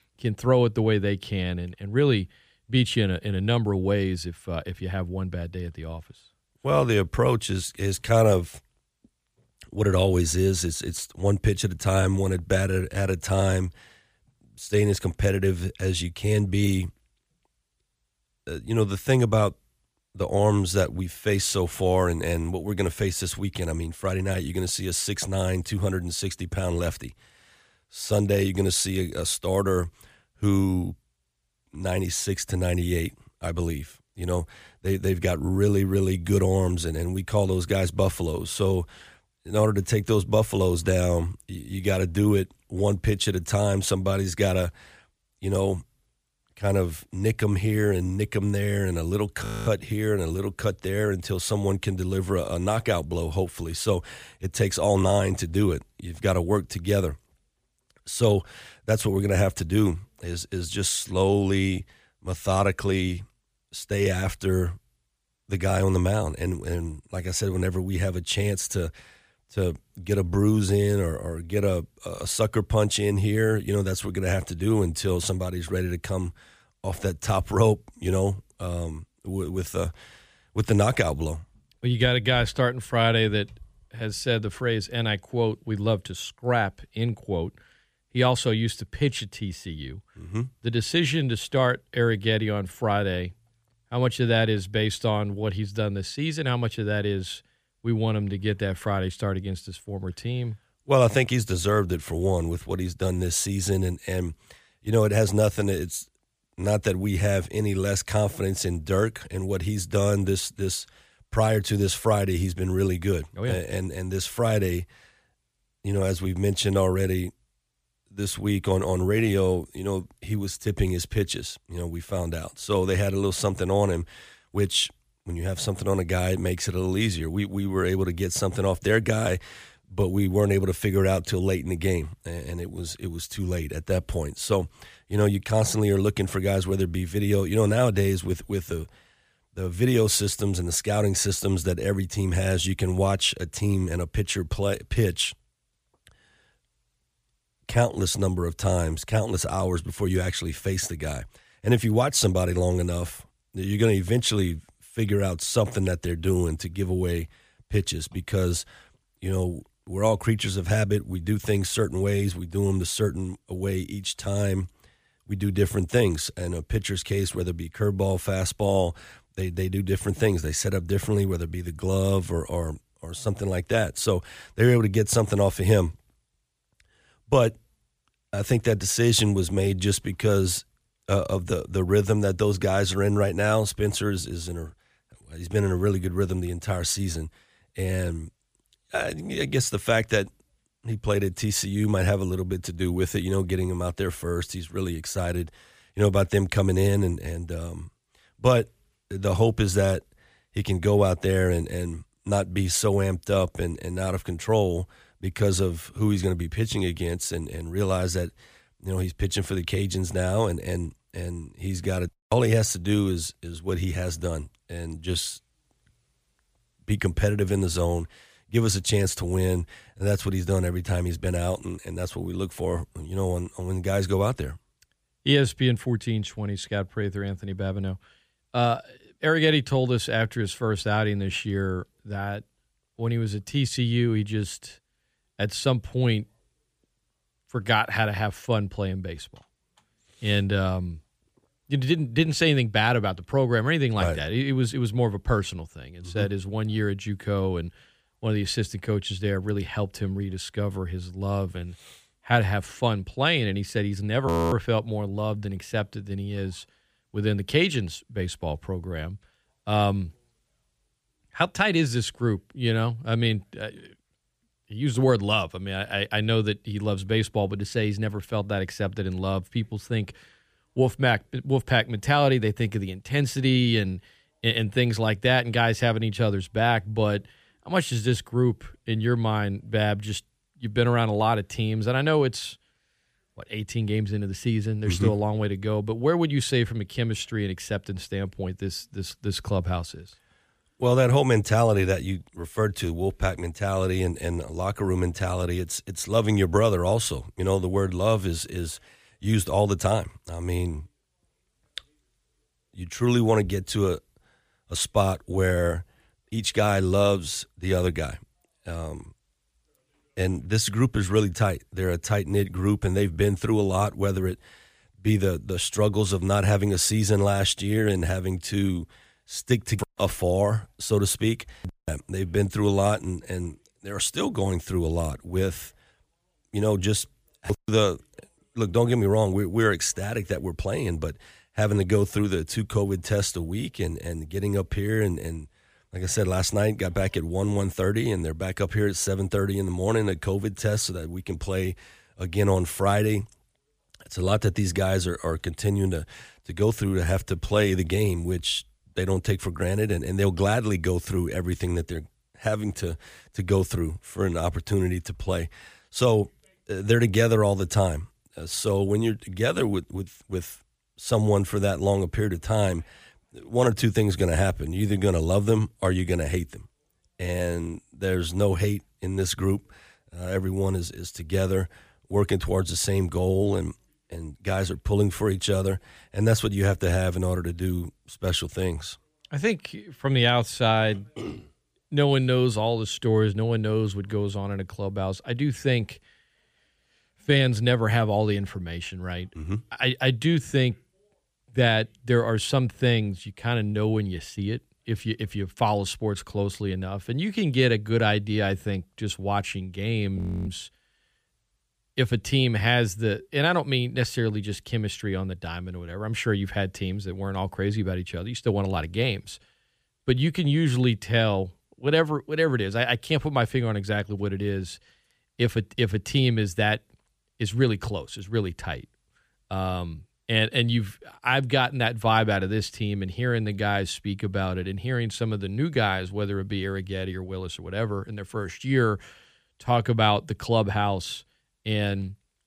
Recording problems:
audio freezing; at 49 s, at 4:14 and at 6:40

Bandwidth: 15 kHz